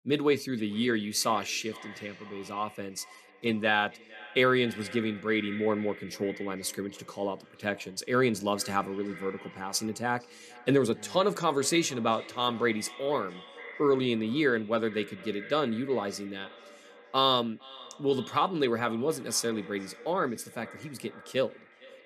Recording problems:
echo of what is said; noticeable; throughout; 460 ms later, 20 dB below the speech

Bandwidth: 13.5 kHz